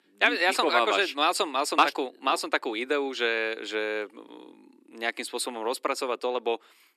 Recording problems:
thin; somewhat; fading below 300 Hz

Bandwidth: 13.5 kHz